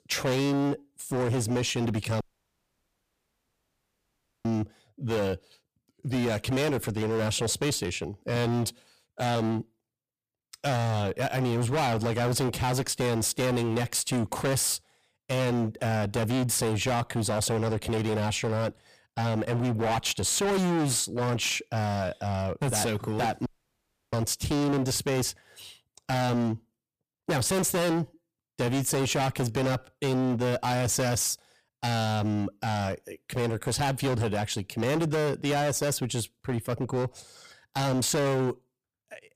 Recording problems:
distortion; heavy; 24% of the sound clipped
audio cutting out; at 2 s for 2 s and at 23 s for 0.5 s

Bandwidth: 15 kHz